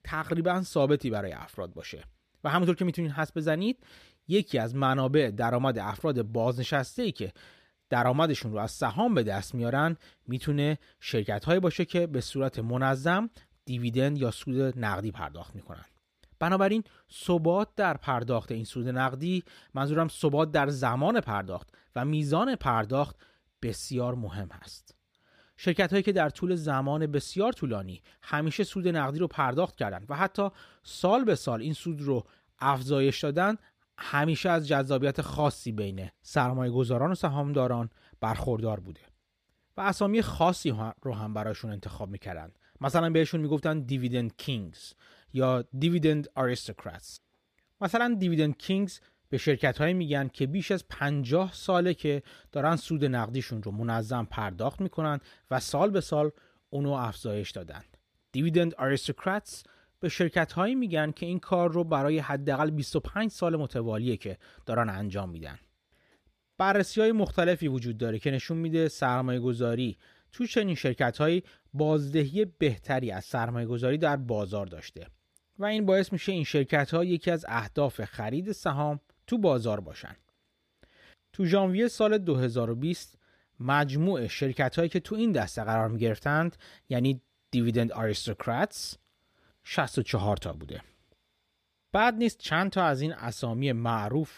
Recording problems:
none

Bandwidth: 14.5 kHz